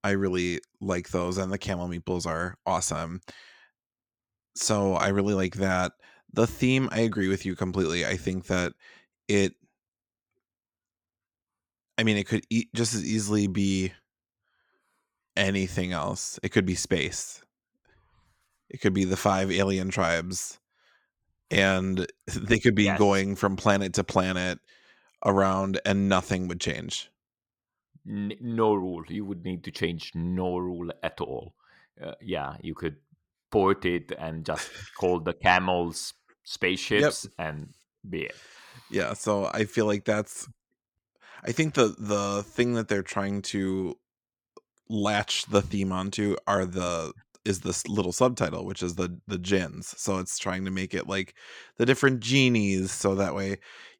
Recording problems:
none

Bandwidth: 19 kHz